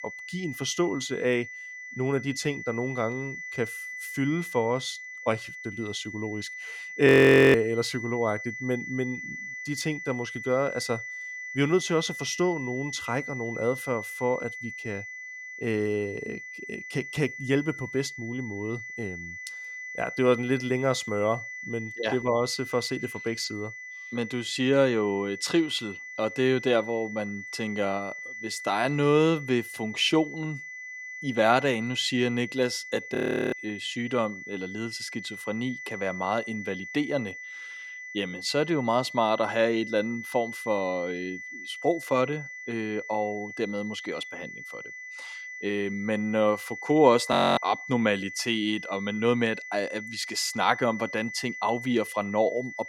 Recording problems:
high-pitched whine; loud; throughout; 2 kHz, 10 dB below the speech
audio freezing; at 7 s, at 33 s and at 47 s

